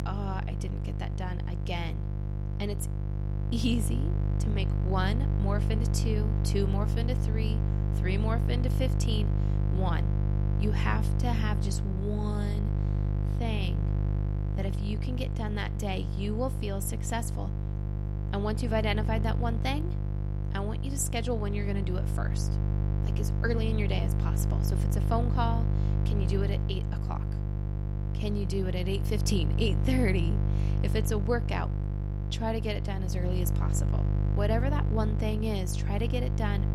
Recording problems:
electrical hum; loud; throughout; 50 Hz, 6 dB below the speech

